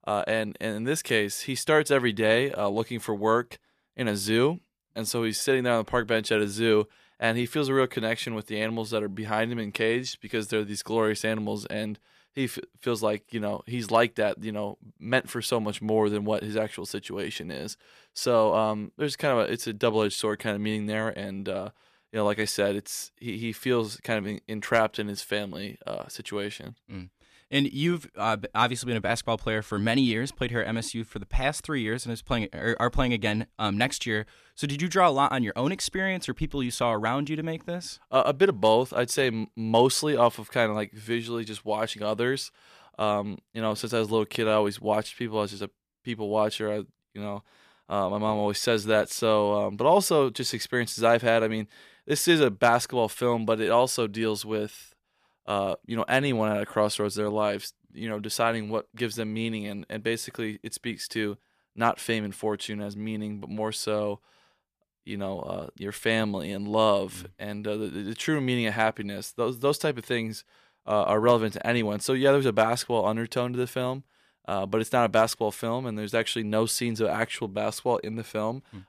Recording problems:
none

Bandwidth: 14.5 kHz